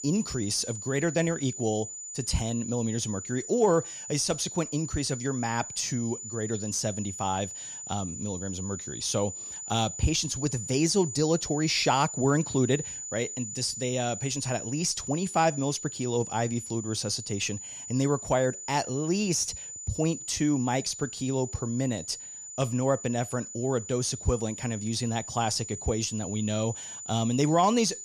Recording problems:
high-pitched whine; loud; throughout; 7 kHz, 8 dB below the speech

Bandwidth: 14.5 kHz